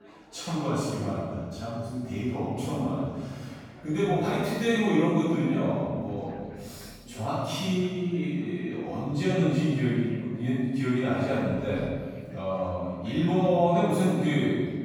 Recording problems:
room echo; strong; dies away in 1.6 s
off-mic speech; far
chatter from many people; faint; throughout; 25 dB below the speech

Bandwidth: 18 kHz